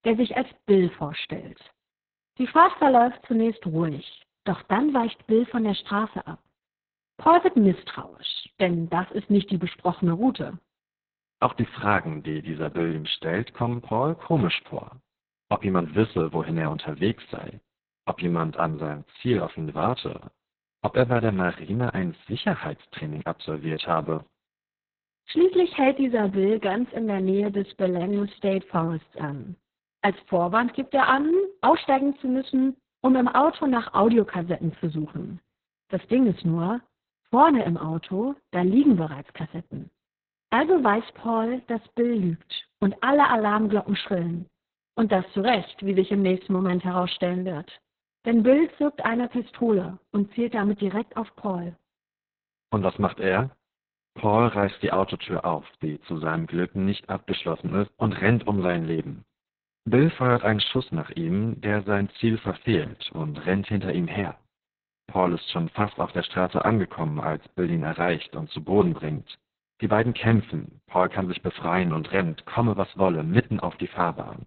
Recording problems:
garbled, watery; badly; nothing above 4 kHz

